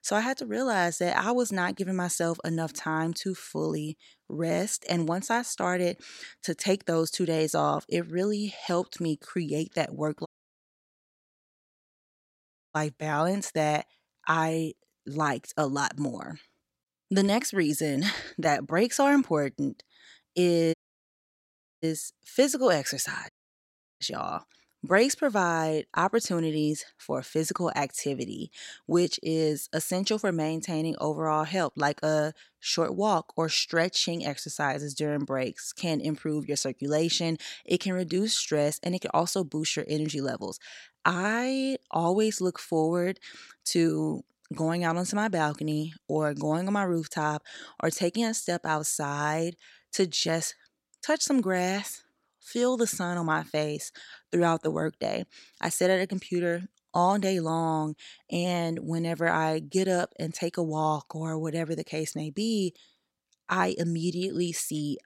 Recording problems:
audio cutting out; at 10 s for 2.5 s, at 21 s for 1 s and at 23 s for 0.5 s

